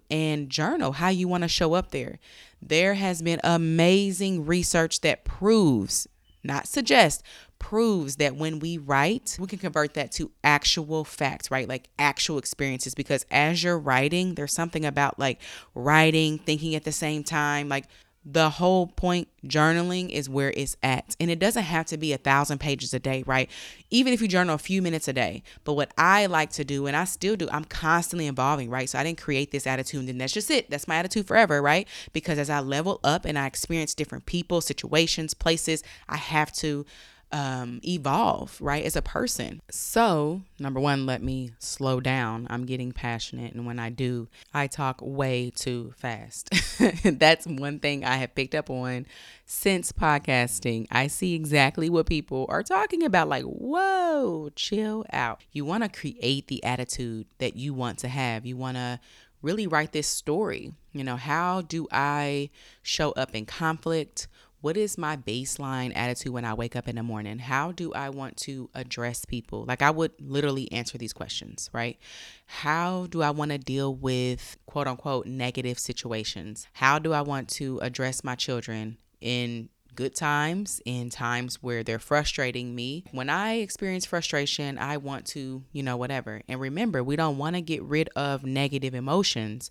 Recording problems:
none

